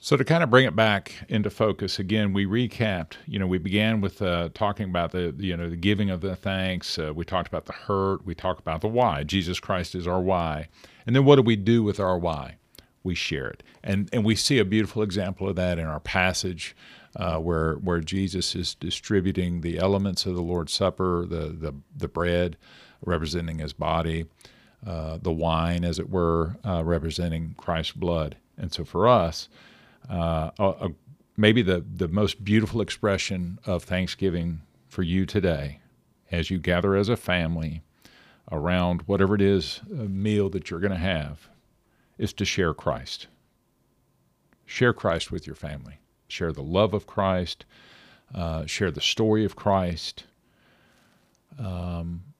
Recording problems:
none

